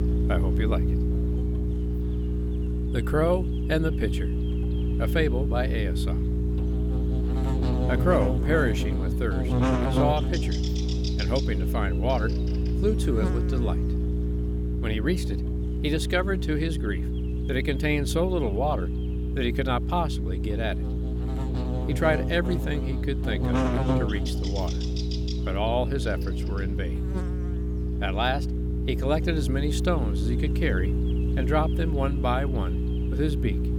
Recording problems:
electrical hum; loud; throughout; 60 Hz, 6 dB below the speech

